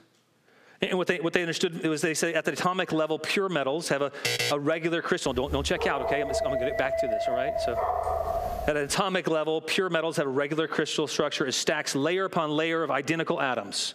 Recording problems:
squashed, flat; somewhat
alarm; loud; at 4 s; peak 1 dB above the speech
dog barking; noticeable; from 5.5 to 9 s; peak level with the speech

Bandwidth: 14.5 kHz